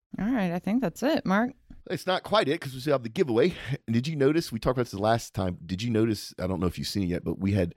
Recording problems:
none

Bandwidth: 16.5 kHz